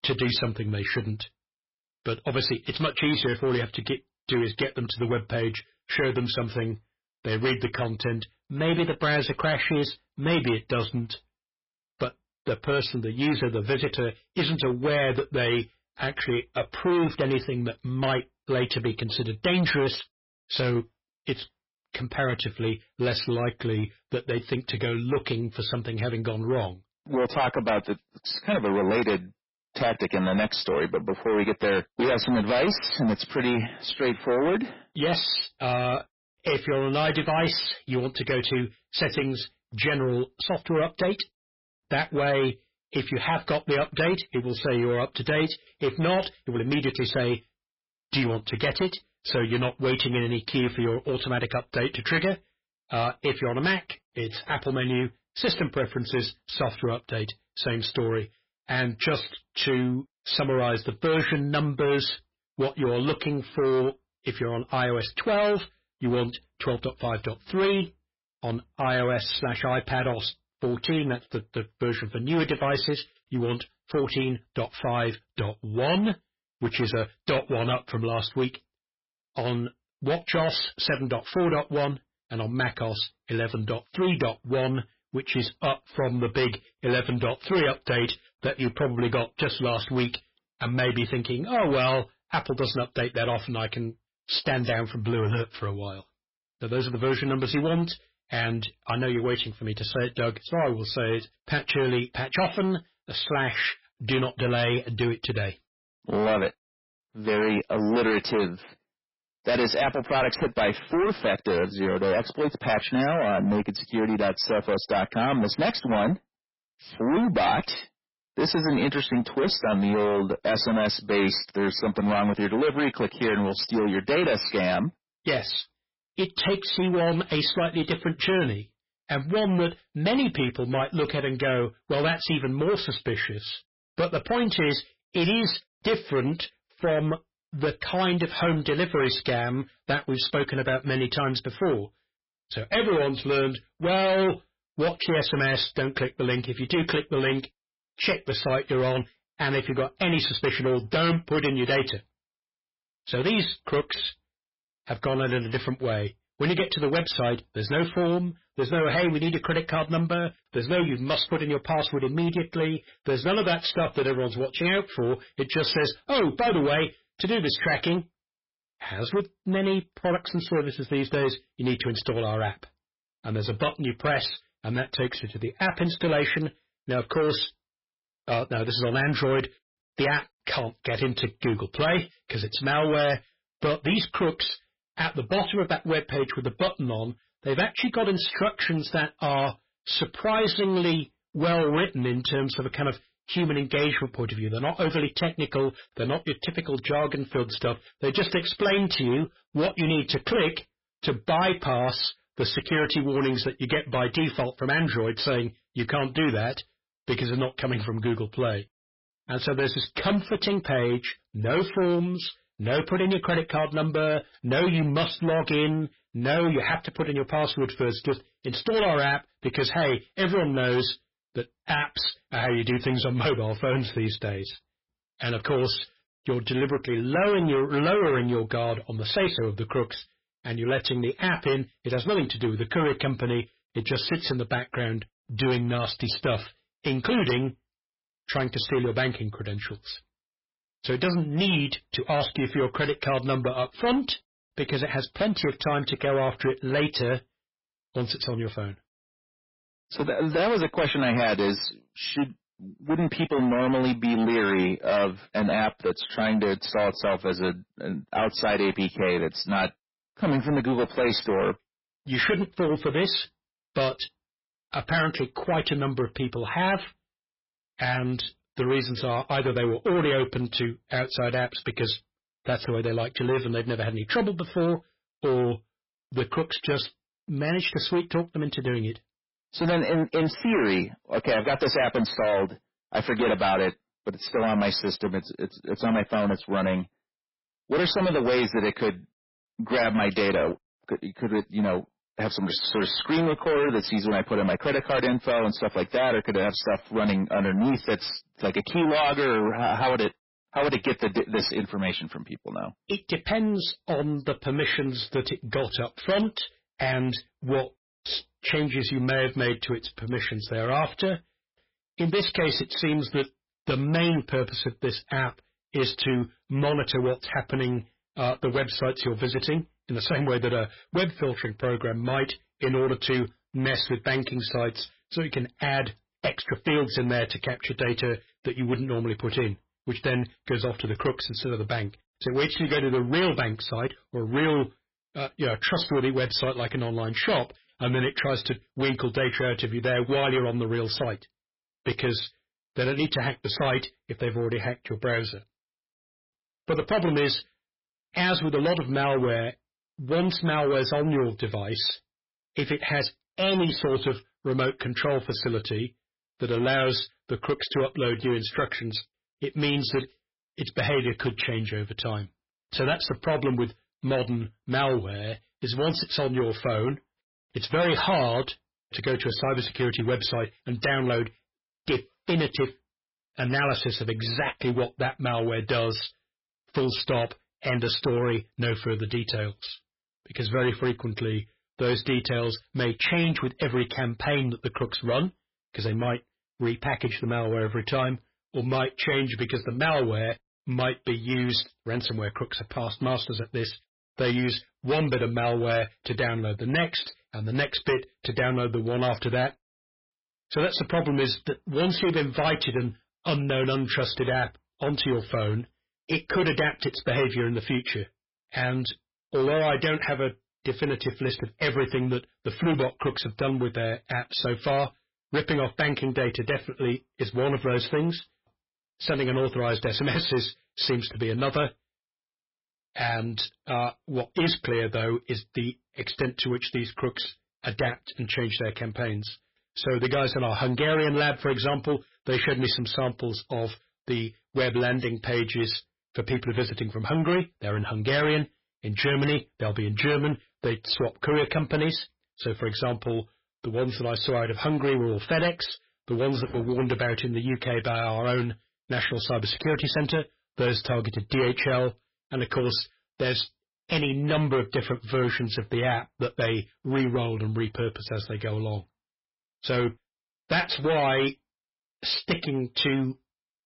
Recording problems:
distortion; heavy; 11% of the sound clipped
garbled, watery; badly; nothing above 5.5 kHz

